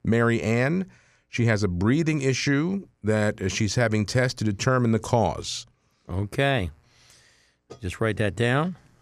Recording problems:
none

